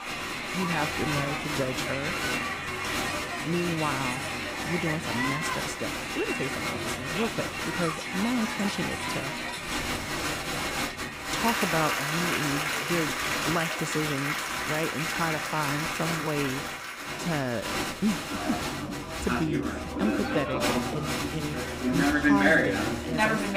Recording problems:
crowd noise; very loud; throughout; 3 dB above the speech

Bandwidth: 15.5 kHz